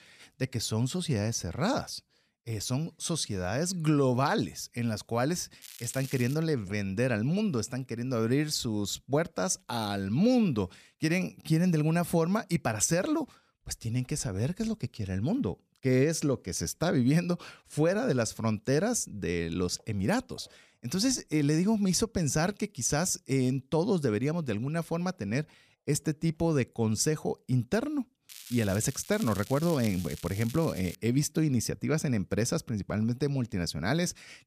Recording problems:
crackling; noticeable; at 5.5 s and from 28 to 31 s; 15 dB below the speech

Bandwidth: 14.5 kHz